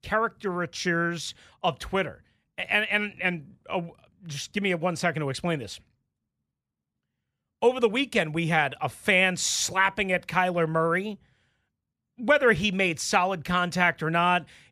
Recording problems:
none

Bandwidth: 14.5 kHz